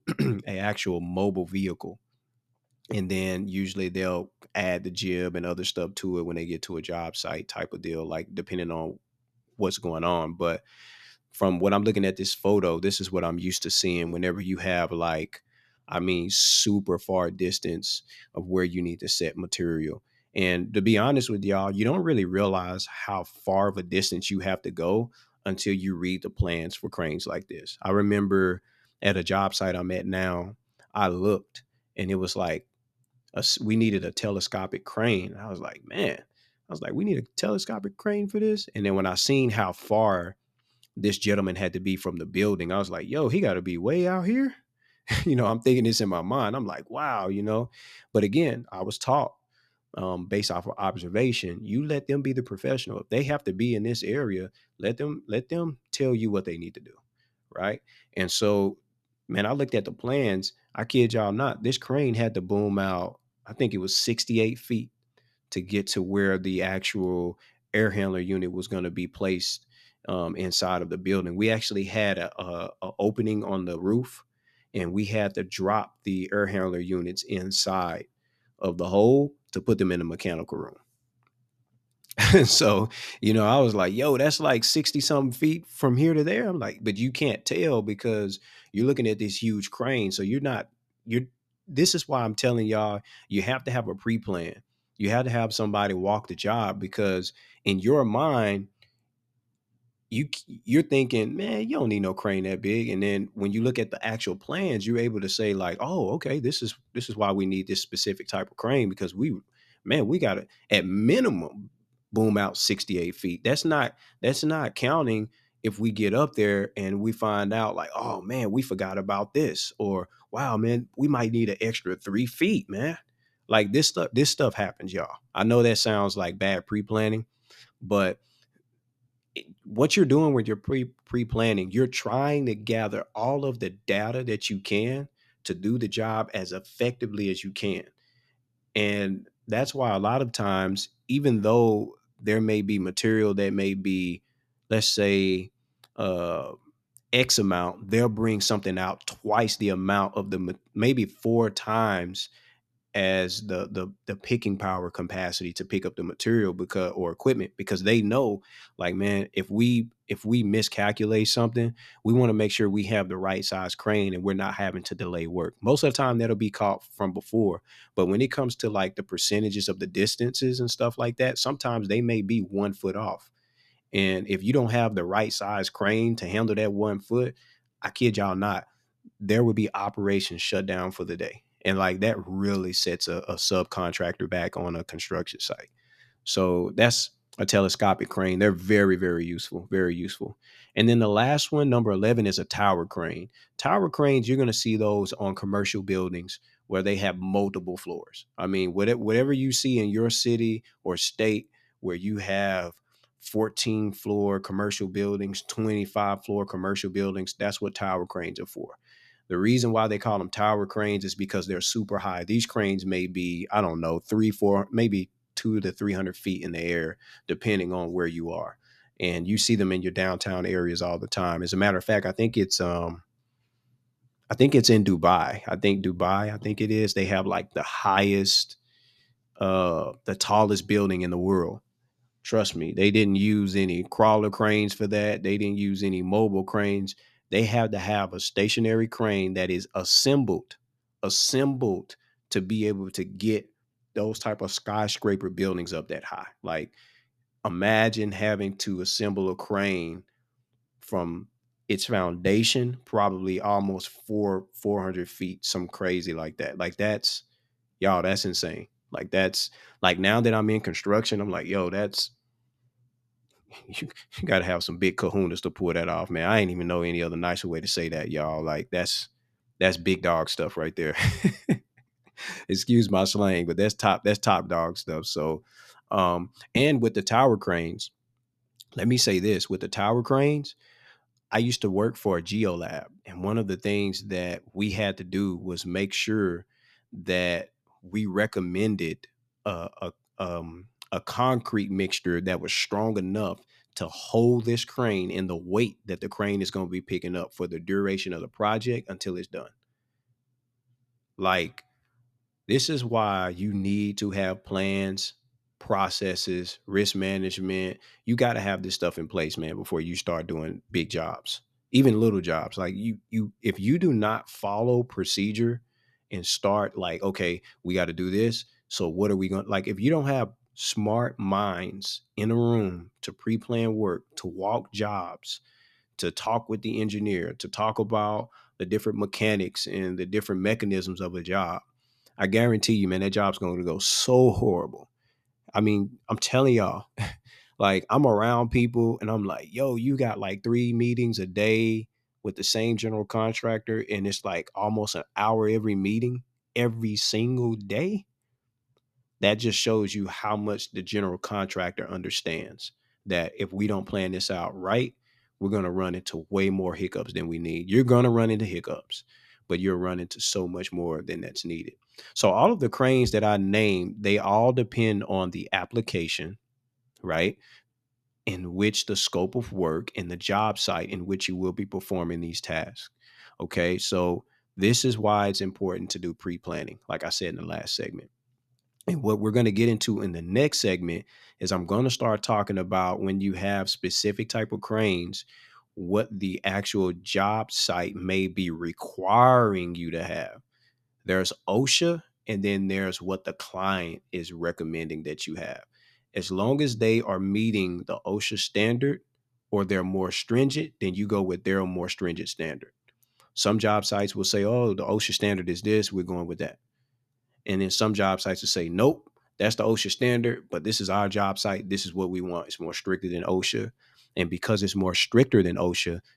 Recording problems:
none

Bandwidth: 14 kHz